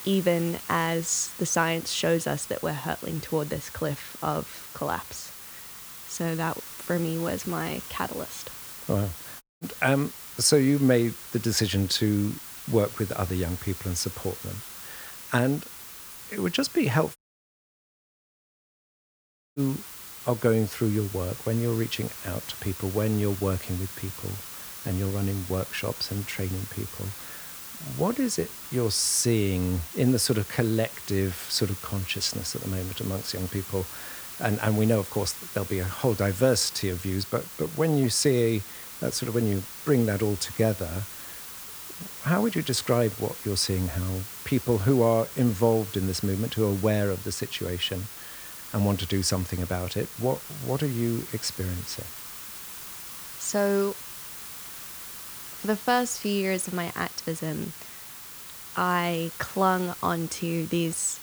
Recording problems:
hiss; noticeable; throughout; 10 dB below the speech
audio cutting out; at 9.5 s and at 17 s for 2.5 s

